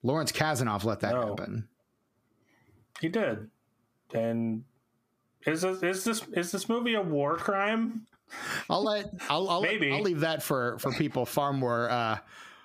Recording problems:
squashed, flat; heavily

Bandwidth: 15 kHz